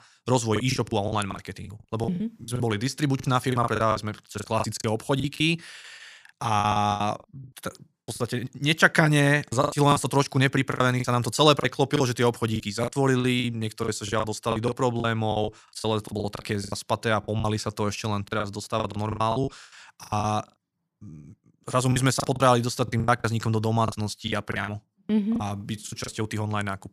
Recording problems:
choppy; very; 15% of the speech affected

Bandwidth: 14.5 kHz